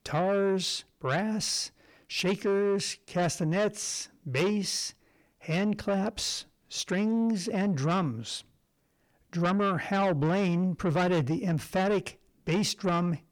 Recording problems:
distortion; slight; 10 dB below the speech

